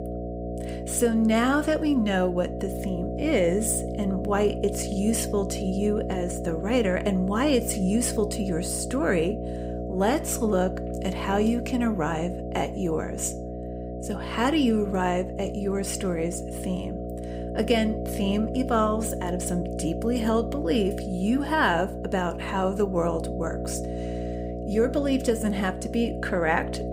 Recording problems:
electrical hum; loud; throughout; 60 Hz, 8 dB below the speech

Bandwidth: 15.5 kHz